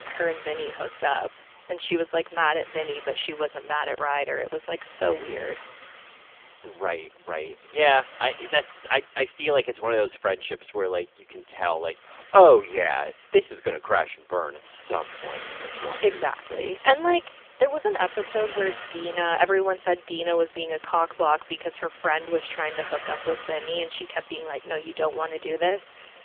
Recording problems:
phone-call audio; poor line; nothing above 3.5 kHz
traffic noise; noticeable; throughout; 15 dB below the speech

